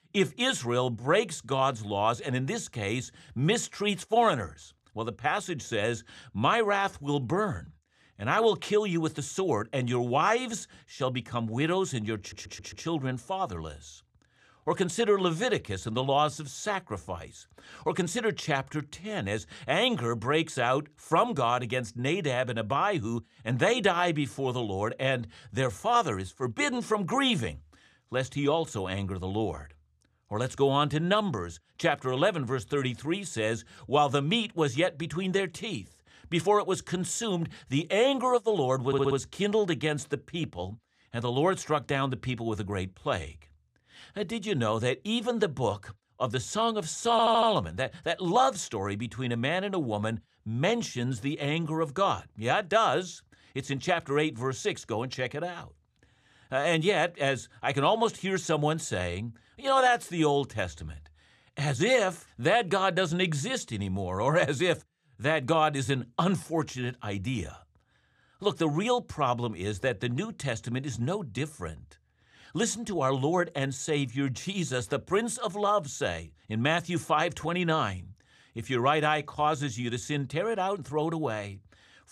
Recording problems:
audio stuttering; at 12 s, at 39 s and at 47 s

